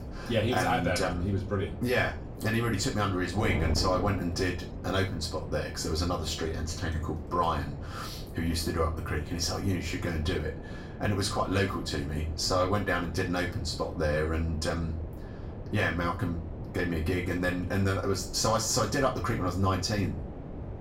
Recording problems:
off-mic speech; far
room echo; slight; dies away in 0.3 s
wind noise on the microphone; occasional gusts; 15 dB below the speech

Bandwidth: 16 kHz